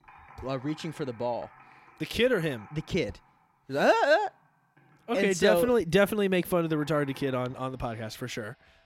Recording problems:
household noises; faint; throughout; 25 dB below the speech

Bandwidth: 16.5 kHz